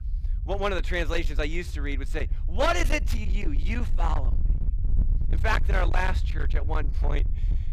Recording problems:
distortion; slight; 17% of the sound clipped
low rumble; noticeable; throughout; 10 dB below the speech

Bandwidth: 15 kHz